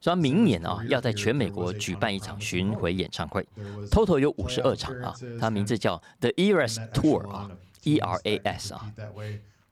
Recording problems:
voice in the background; noticeable; throughout; 15 dB below the speech

